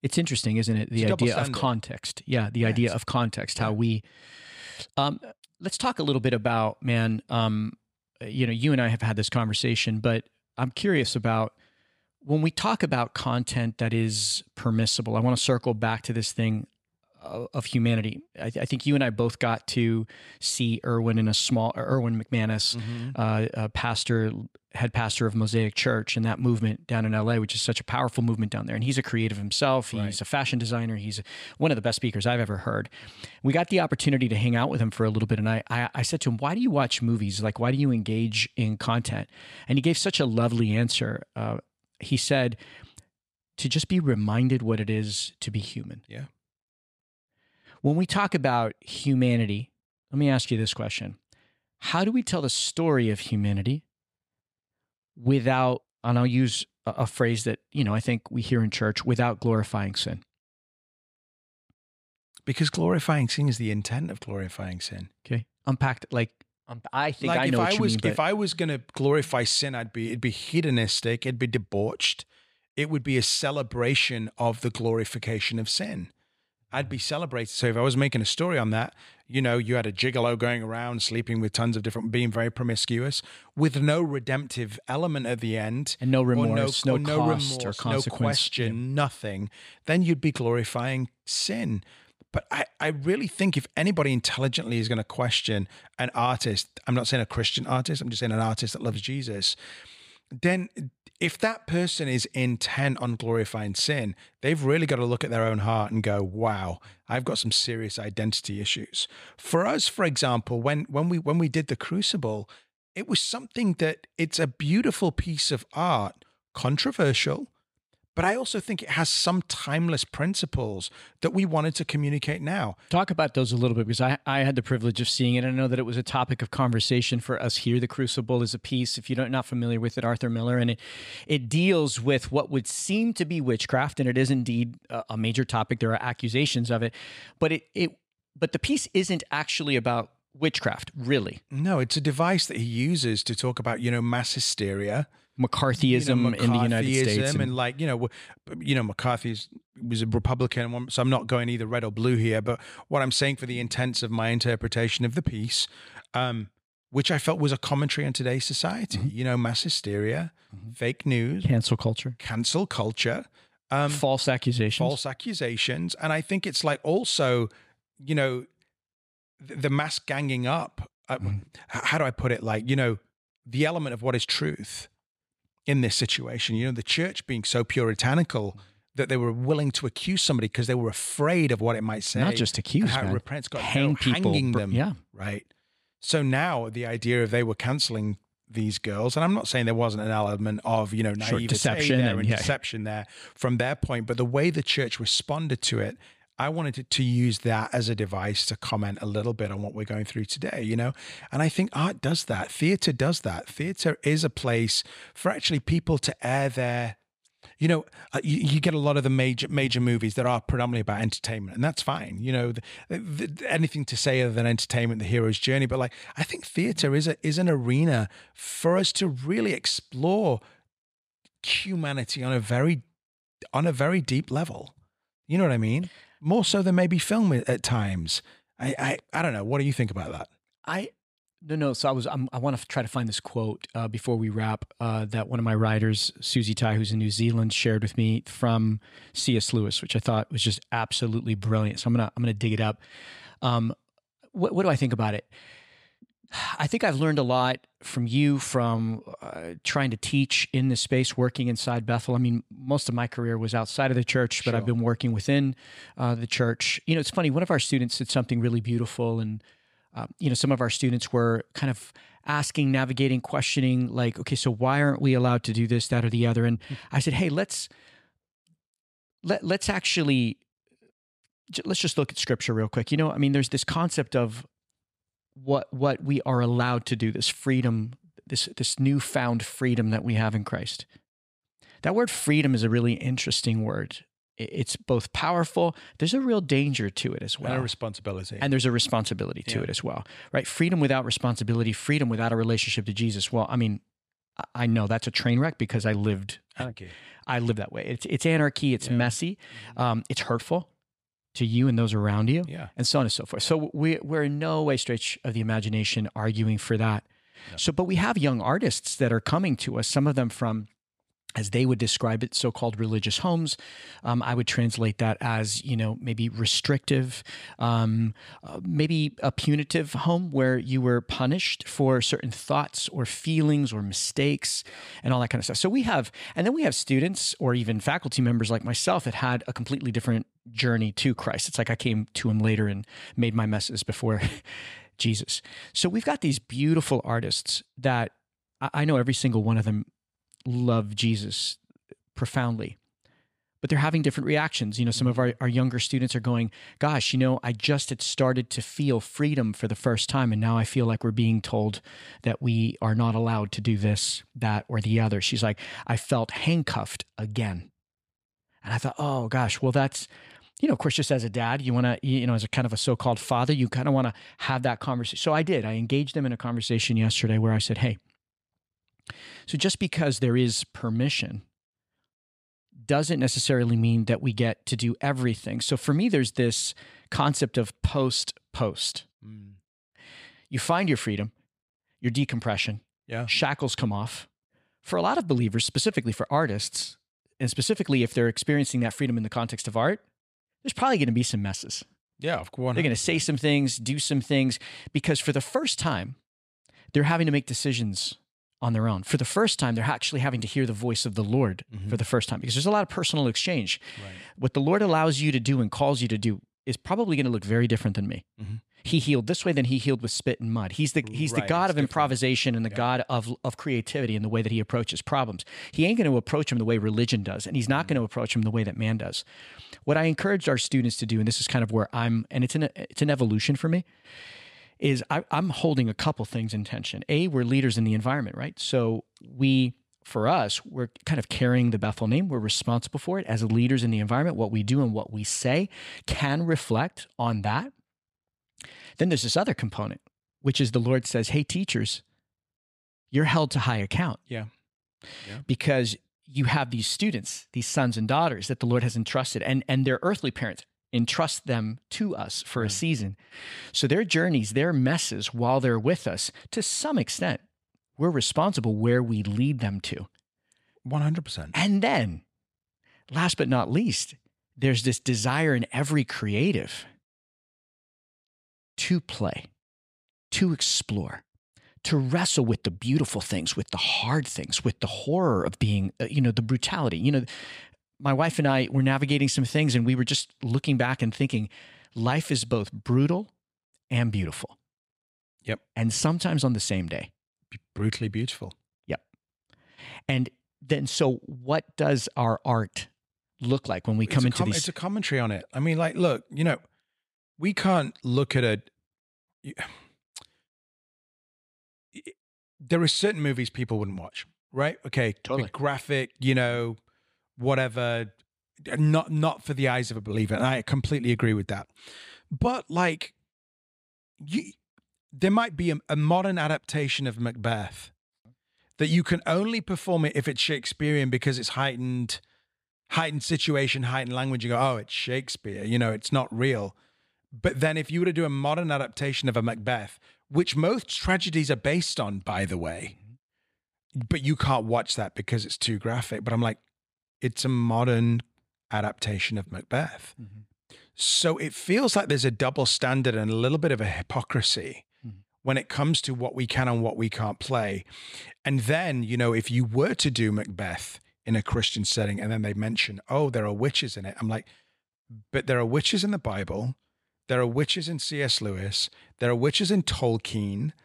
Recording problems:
none

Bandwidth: 14.5 kHz